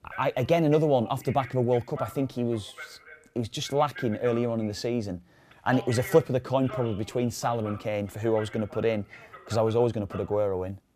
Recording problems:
voice in the background; noticeable; throughout; 15 dB below the speech

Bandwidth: 14.5 kHz